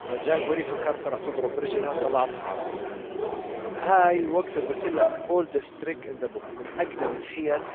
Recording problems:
phone-call audio; poor line
traffic noise; loud; throughout; 5 dB below the speech

